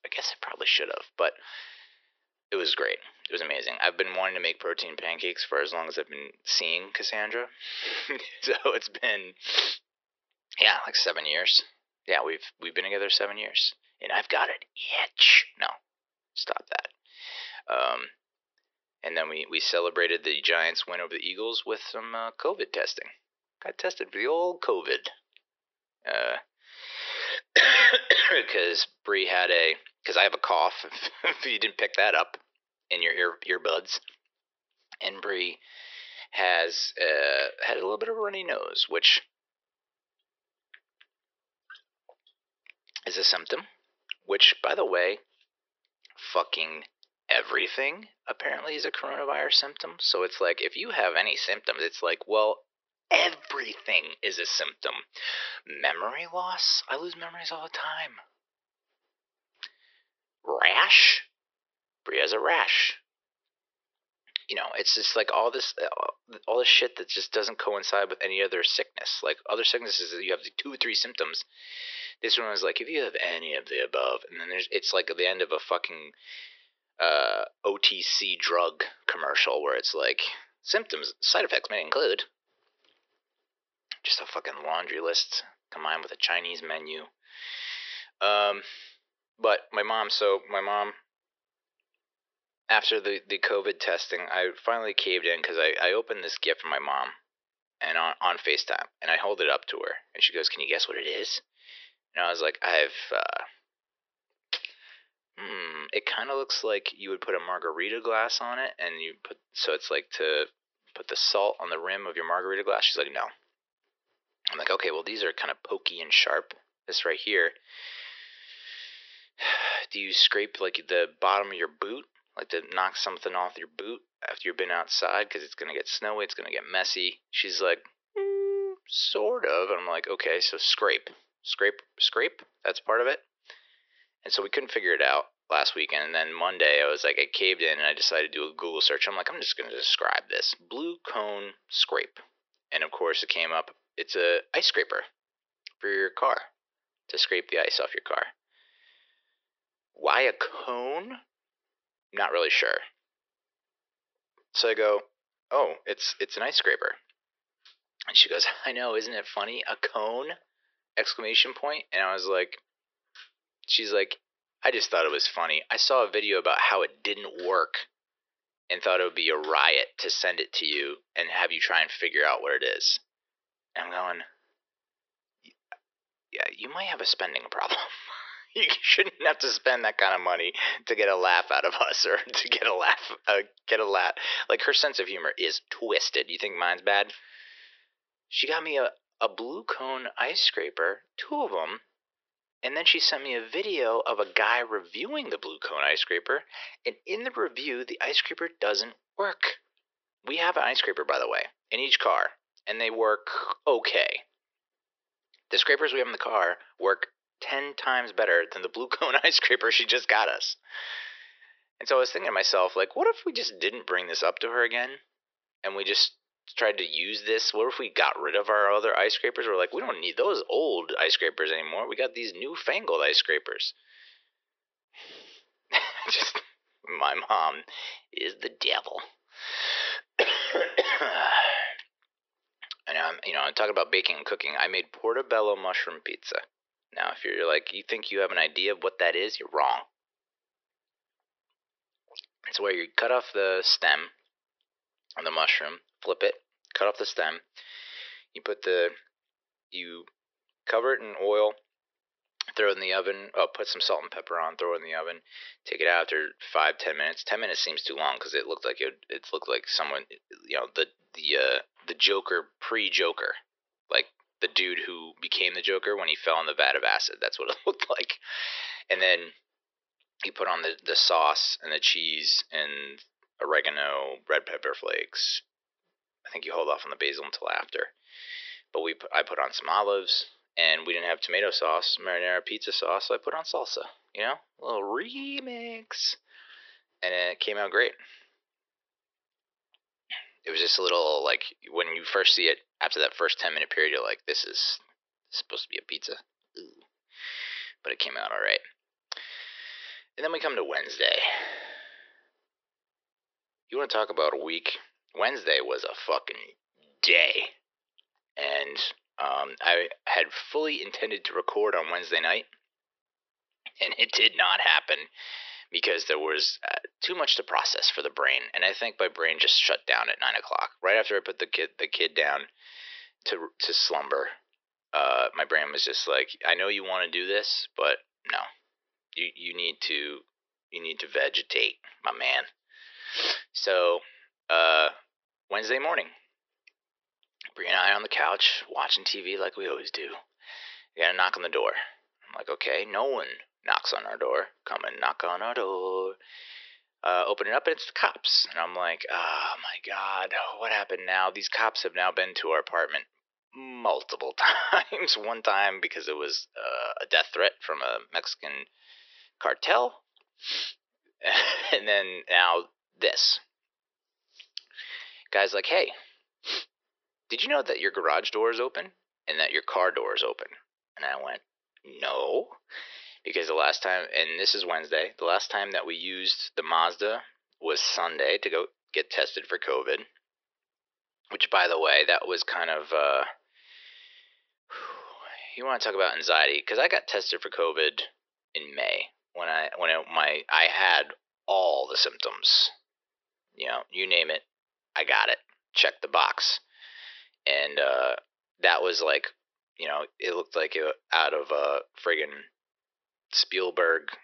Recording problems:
thin; very; fading below 350 Hz
high frequencies cut off; noticeable; nothing above 5.5 kHz

